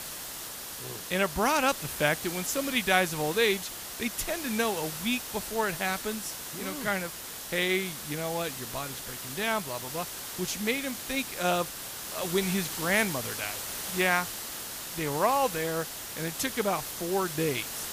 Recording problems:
hiss; loud; throughout; 6 dB below the speech

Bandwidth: 15 kHz